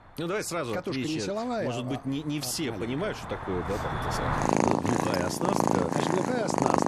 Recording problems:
animal sounds; very loud; throughout; 3 dB above the speech

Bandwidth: 13.5 kHz